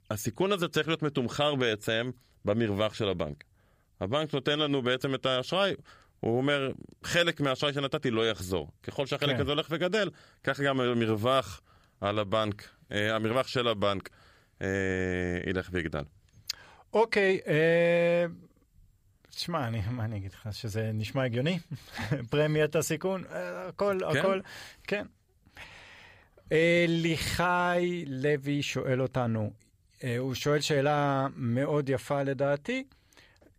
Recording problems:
none

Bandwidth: 15 kHz